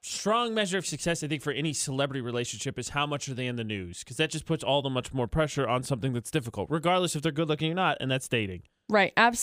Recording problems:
abrupt cut into speech; at the end

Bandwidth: 15.5 kHz